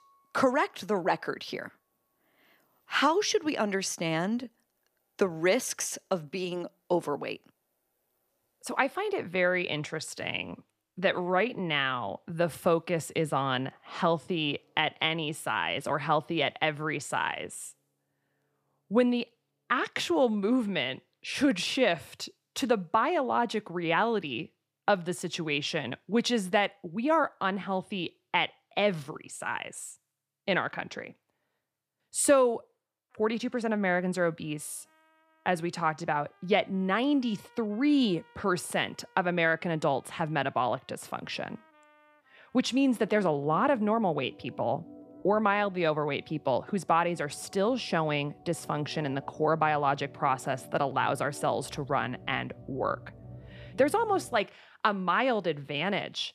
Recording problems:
background music; faint; throughout; 25 dB below the speech

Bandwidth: 14.5 kHz